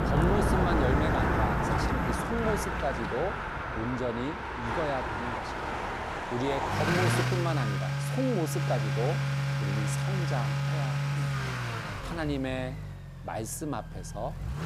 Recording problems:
traffic noise; very loud; throughout; 4 dB above the speech

